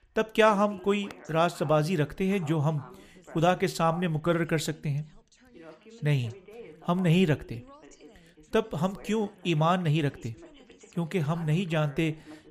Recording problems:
background chatter; faint; throughout; 2 voices, 20 dB below the speech

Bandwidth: 15 kHz